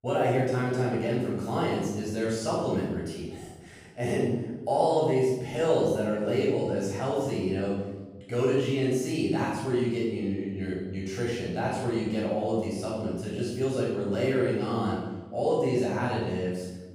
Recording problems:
room echo; strong; dies away in 1 s
off-mic speech; far

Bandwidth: 15 kHz